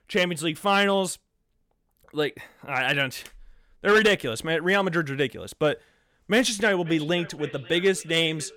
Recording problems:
echo of what is said; faint; from 7 s on; 530 ms later, 20 dB below the speech

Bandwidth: 17 kHz